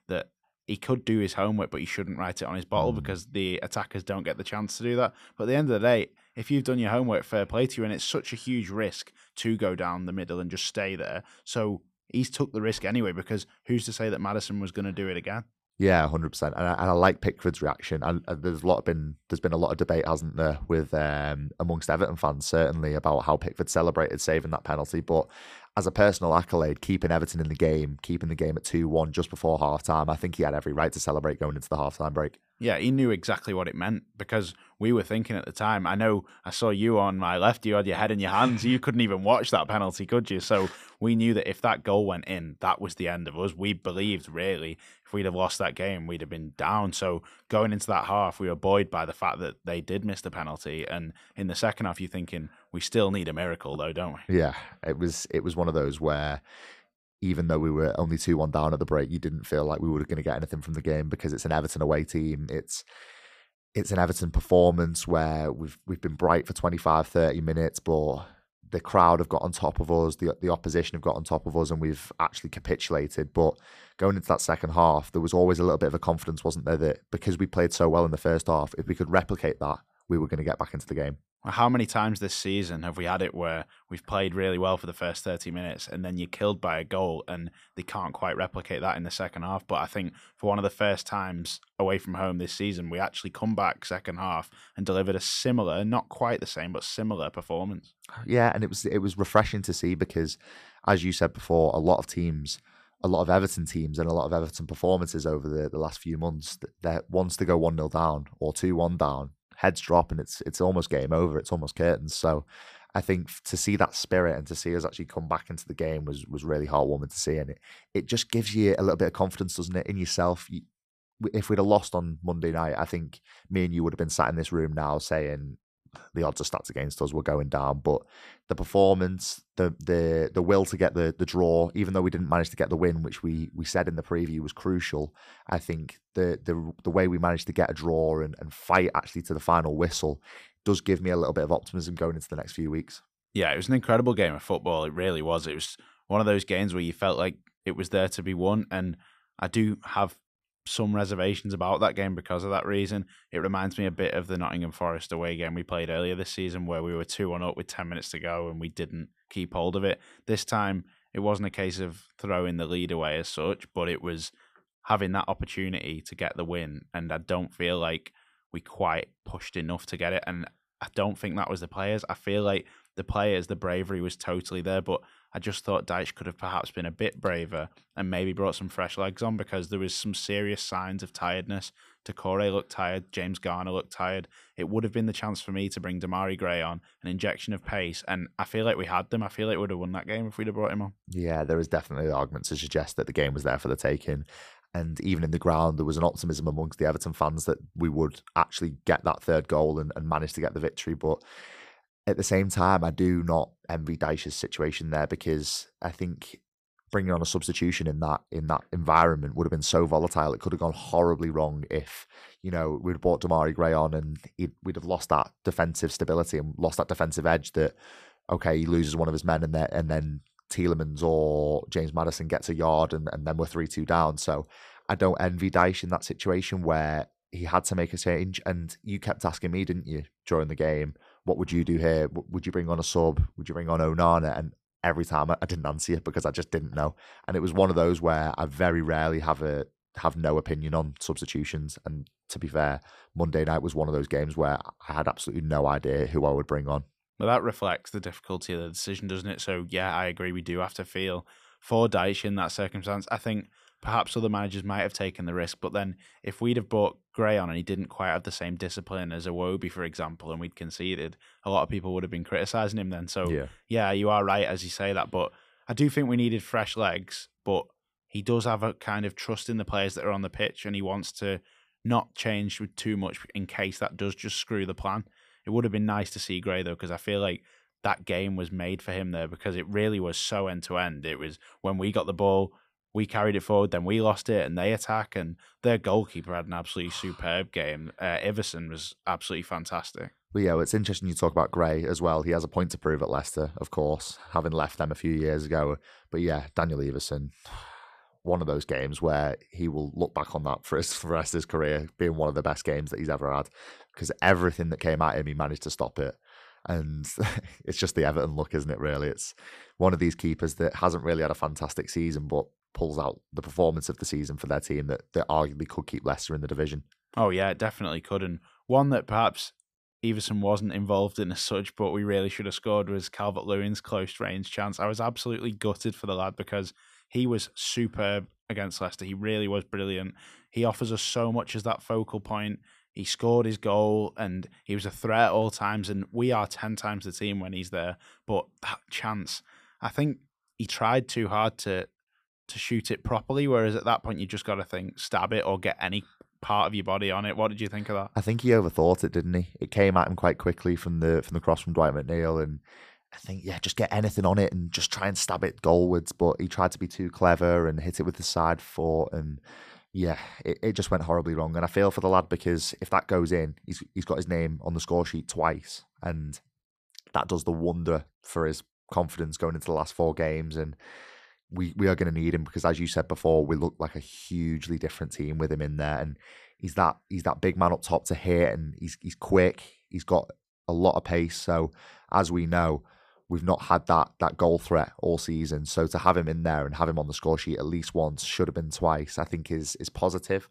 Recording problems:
none

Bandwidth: 14.5 kHz